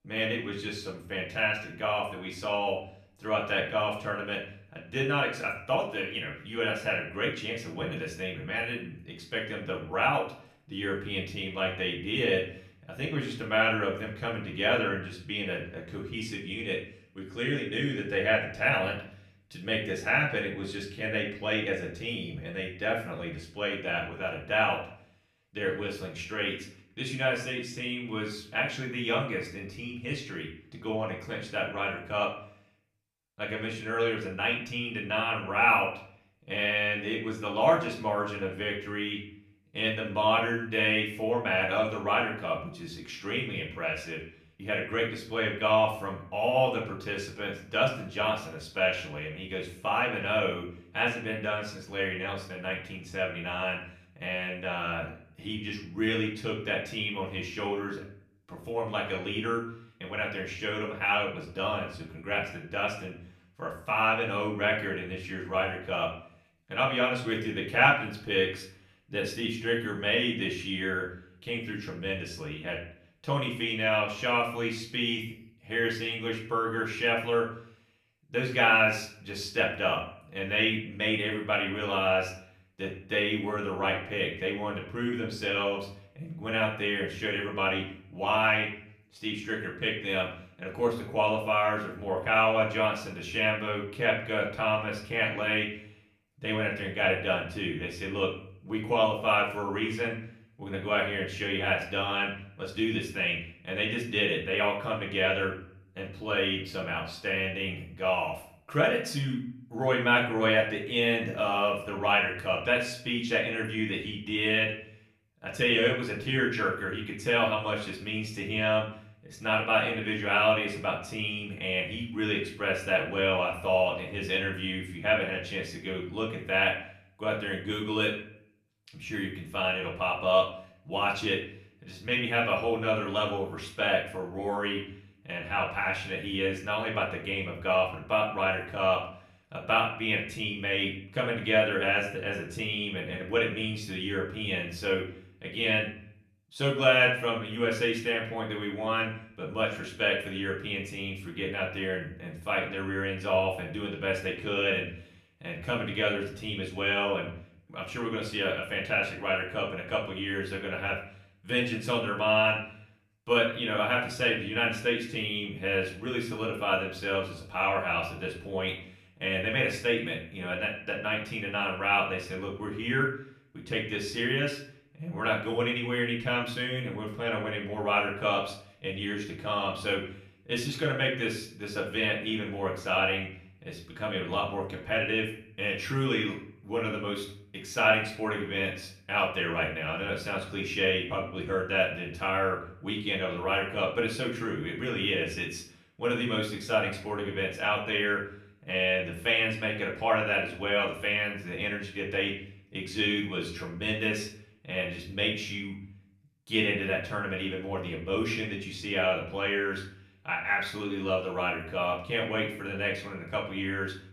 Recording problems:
off-mic speech; far
room echo; slight; dies away in 0.5 s

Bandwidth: 14.5 kHz